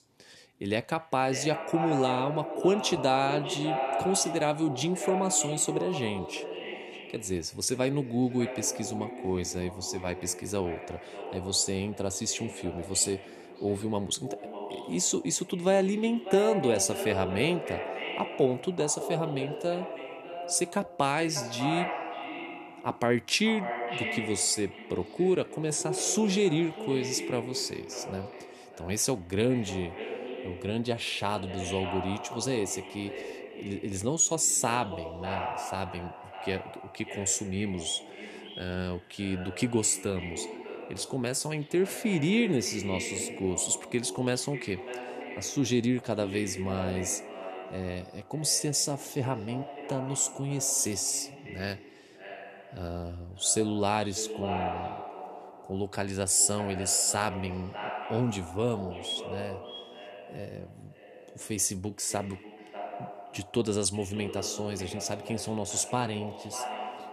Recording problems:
echo of what is said; strong; throughout; 600 ms later, 9 dB below the speech

